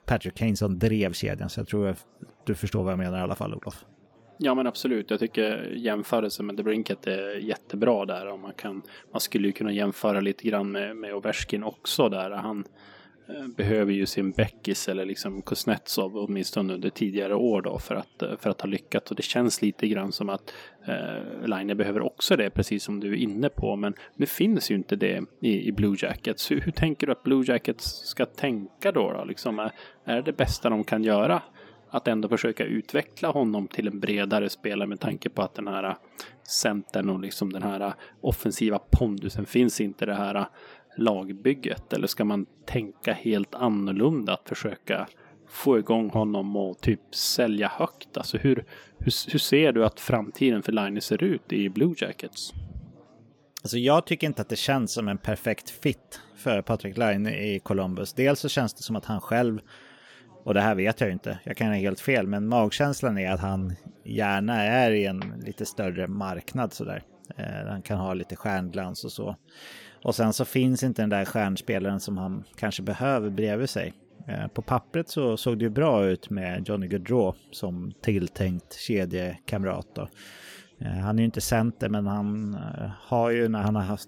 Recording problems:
chatter from many people; faint; throughout; 30 dB below the speech

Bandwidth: 17.5 kHz